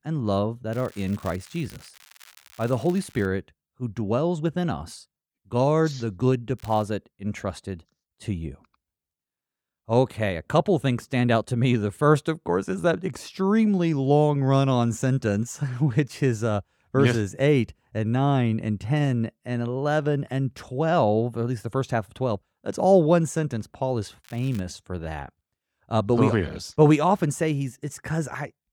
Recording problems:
crackling; faint; from 0.5 to 3.5 s, at 6.5 s and at 24 s; 25 dB below the speech

